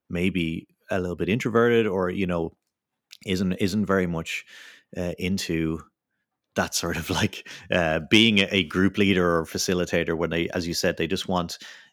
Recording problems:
none

